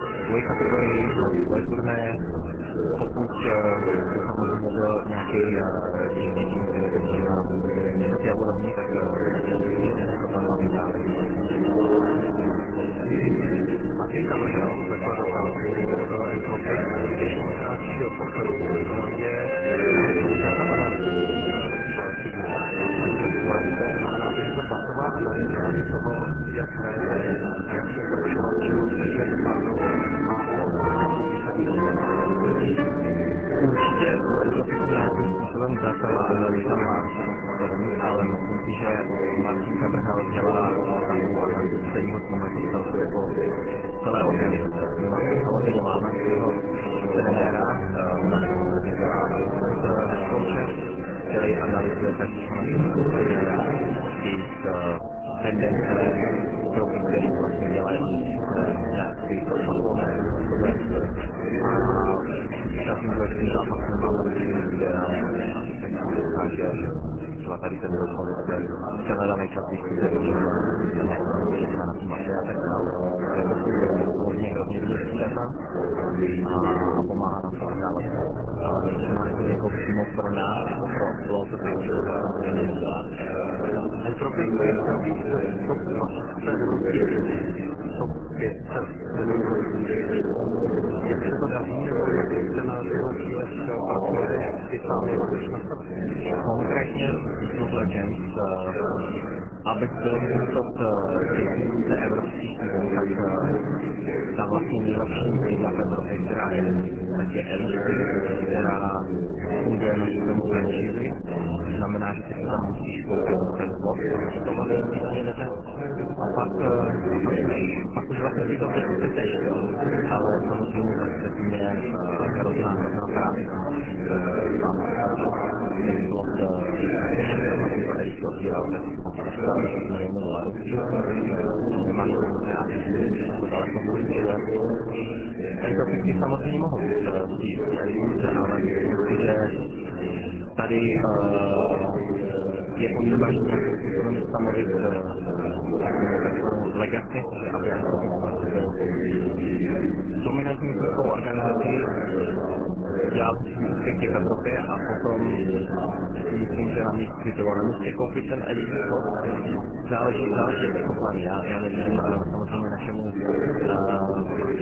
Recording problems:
garbled, watery; badly
chatter from many people; very loud; throughout; 2 dB above the speech
background music; loud; until 1:05; 3 dB below the speech

